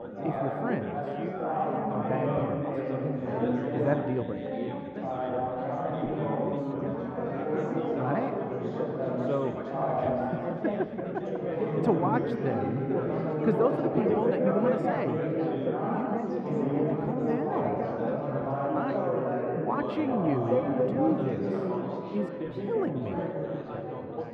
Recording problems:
muffled; very; fading above 4 kHz
chatter from many people; very loud; throughout; 3 dB above the speech

